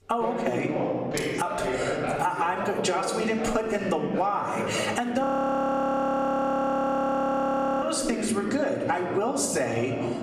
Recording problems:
room echo; slight; dies away in 0.9 s
off-mic speech; somewhat distant
squashed, flat; somewhat, background pumping
voice in the background; loud; throughout; 7 dB below the speech
audio freezing; at 5 s for 2.5 s

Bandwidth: 15 kHz